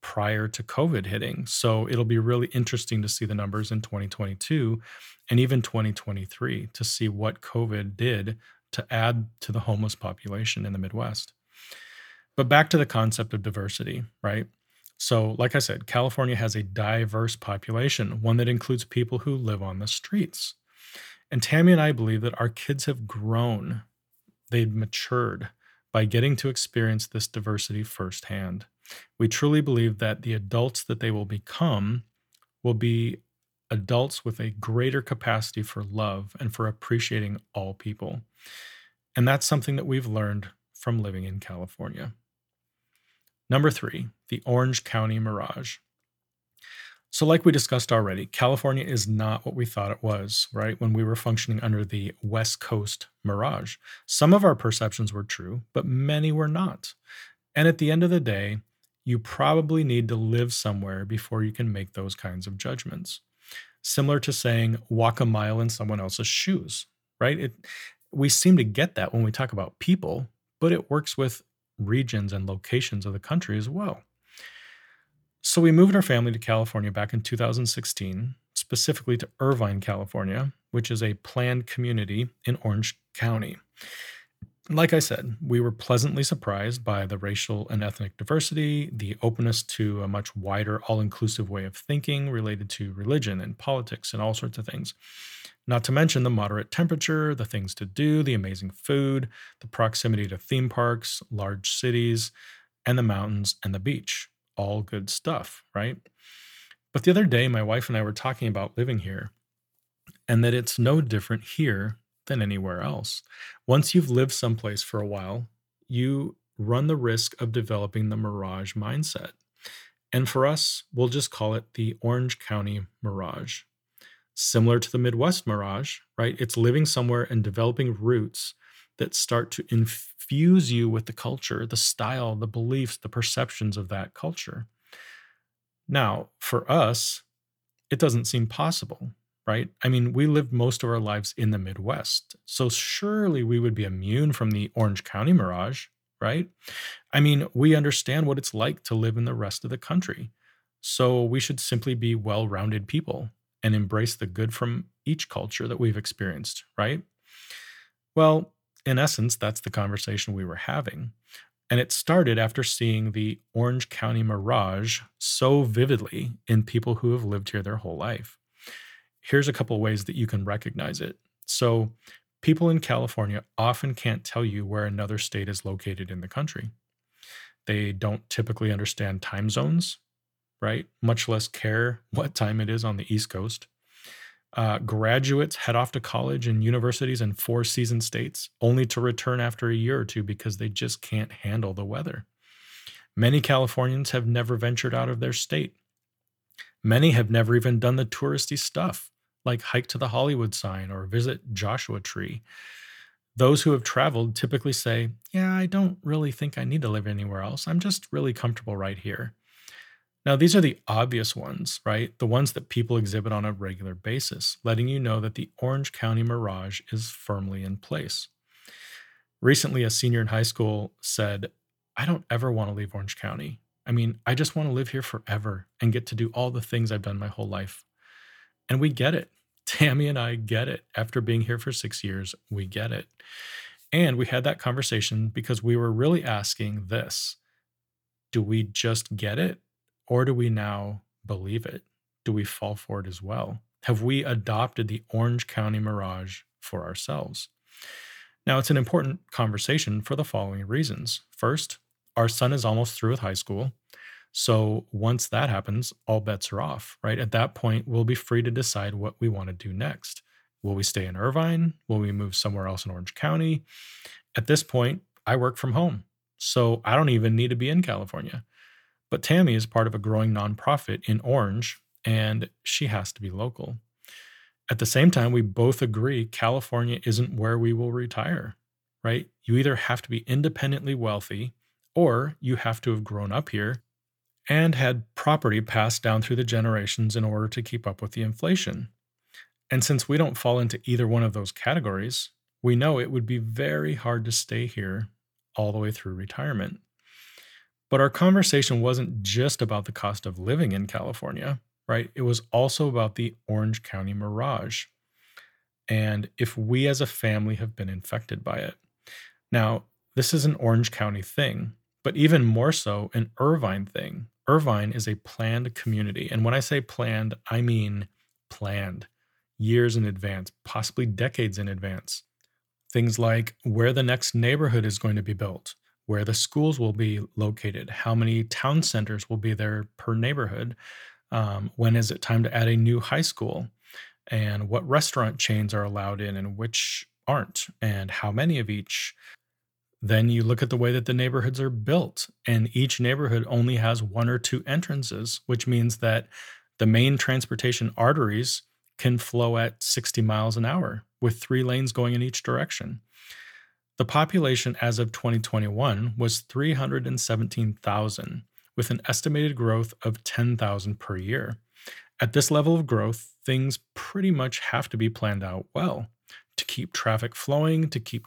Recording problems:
none

